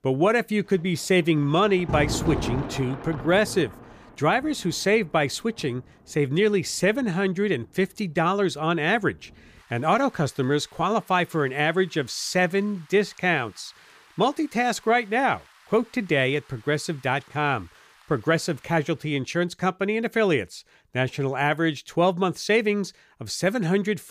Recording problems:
rain or running water; noticeable; until 19 s; 10 dB below the speech

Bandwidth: 15 kHz